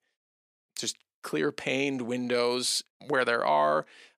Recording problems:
thin; very slightly; fading below 300 Hz

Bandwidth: 15 kHz